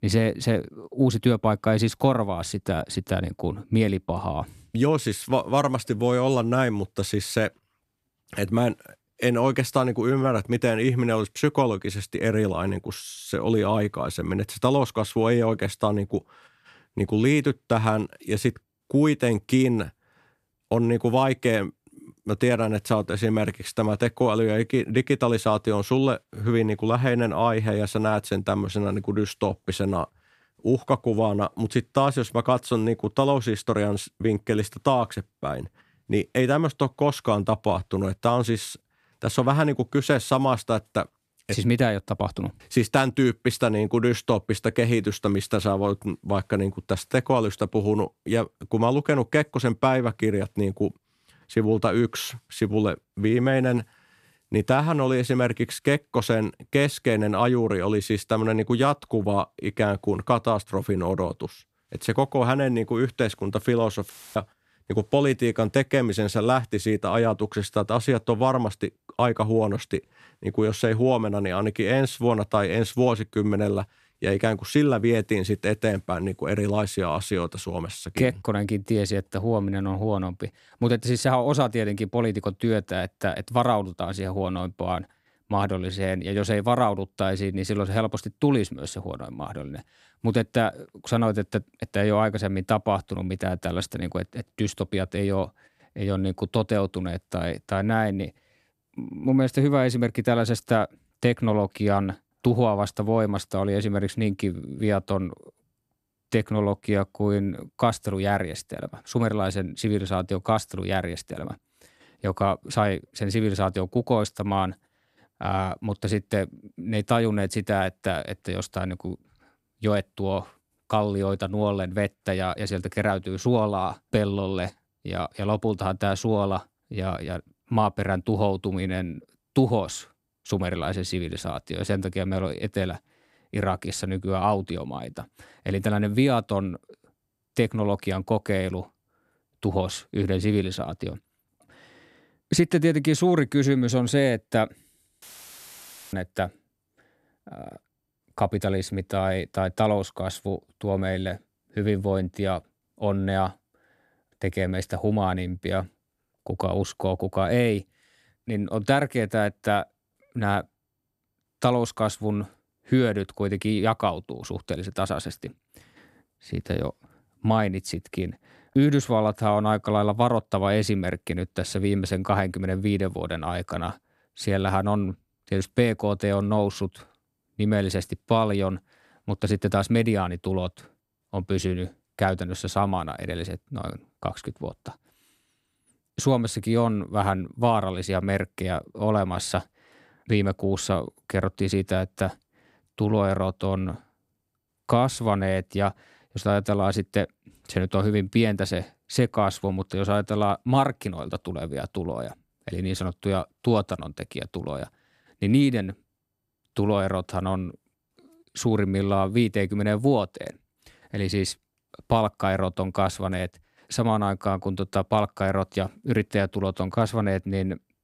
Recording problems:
audio cutting out; filled with static; at 1:04 and at 2:25 for 1 s

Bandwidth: 13.5 kHz